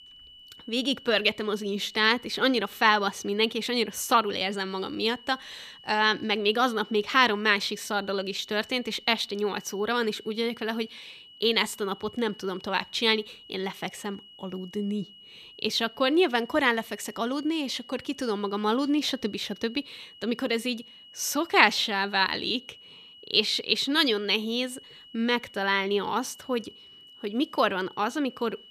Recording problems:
high-pitched whine; faint; throughout; 3 kHz, 20 dB below the speech

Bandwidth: 14.5 kHz